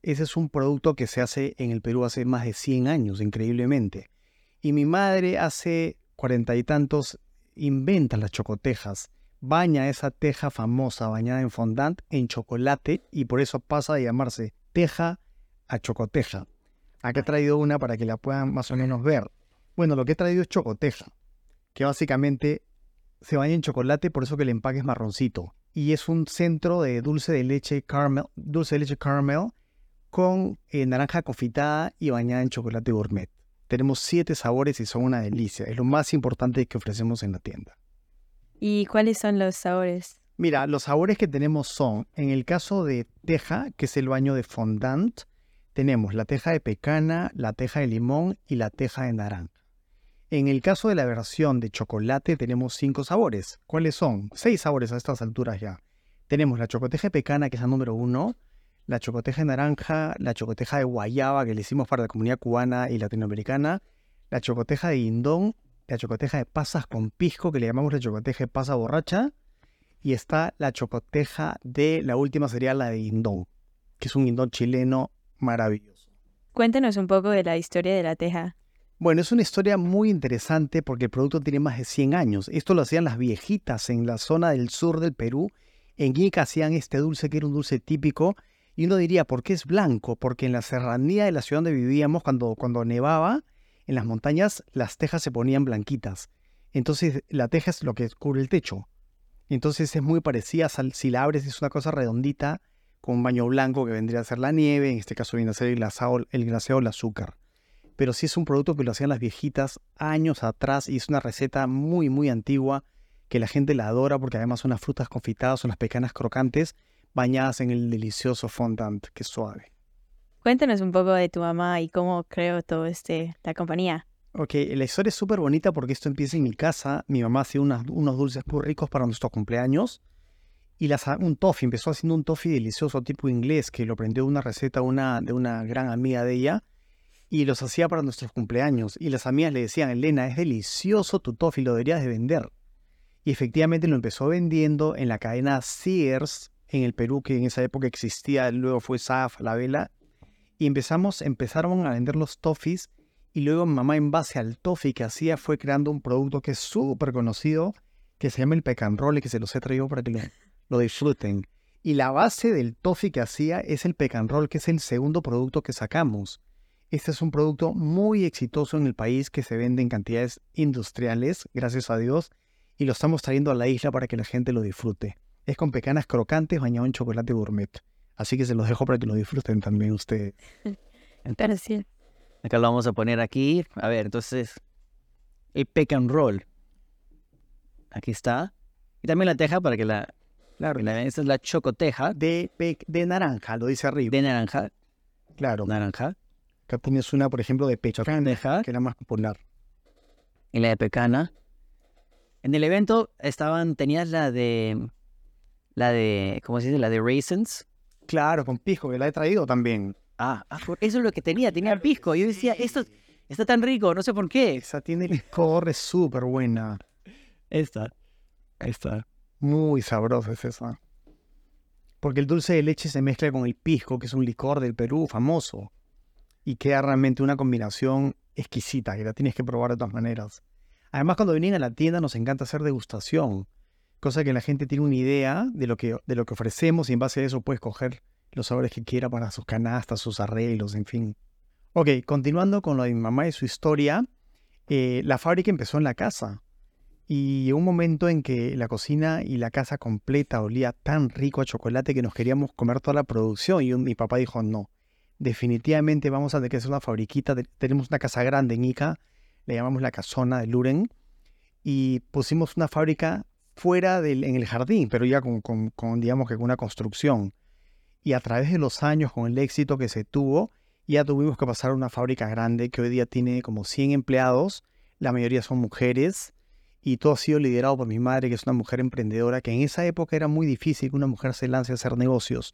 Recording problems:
none

